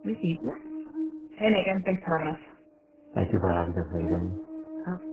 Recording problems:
garbled, watery; badly; nothing above 3 kHz
electrical hum; noticeable; throughout; 60 Hz, 10 dB below the speech

